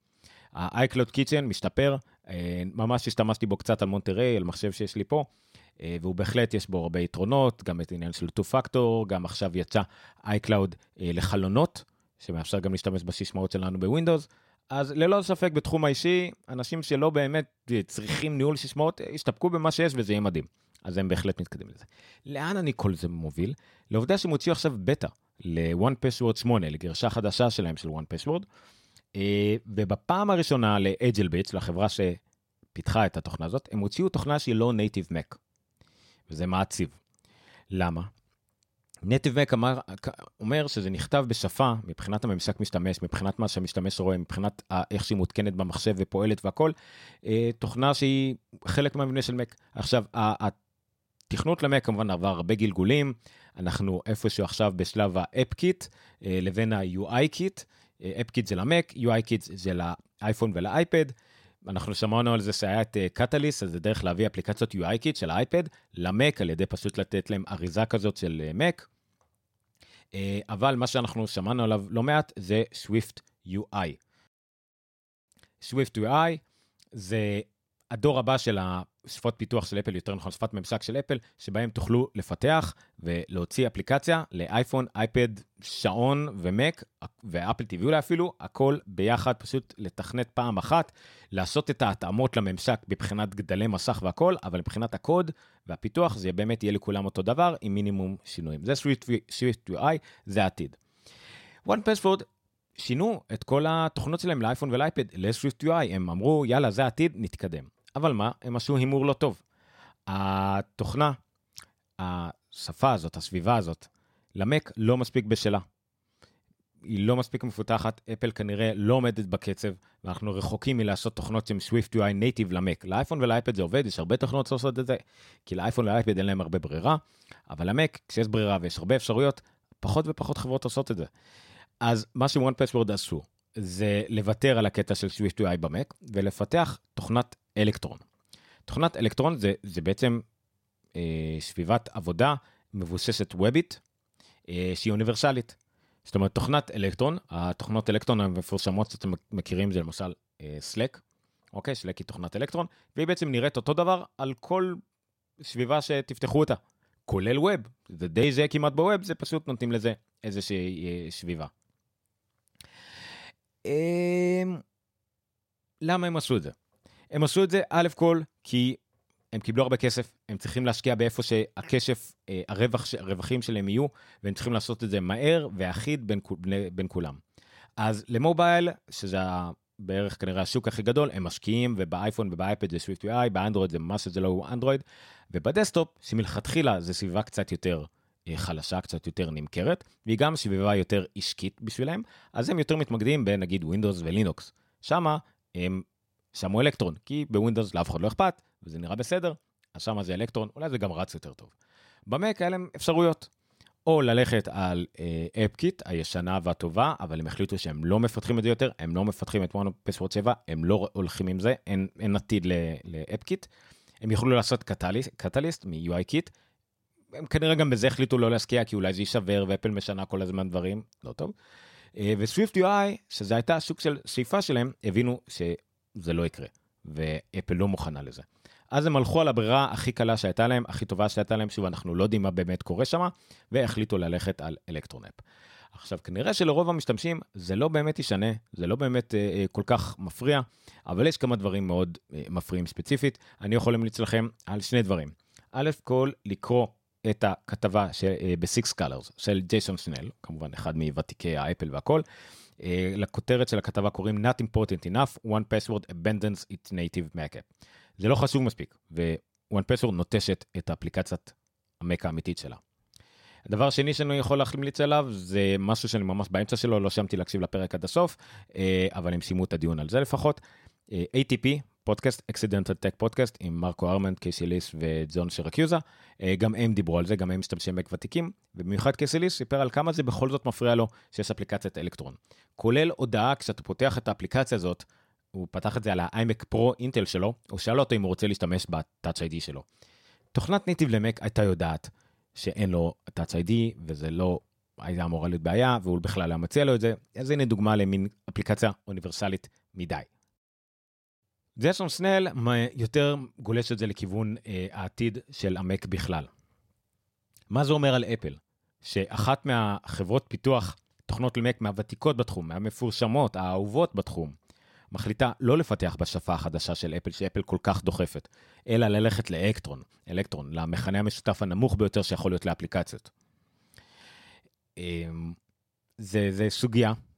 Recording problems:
none

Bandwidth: 16.5 kHz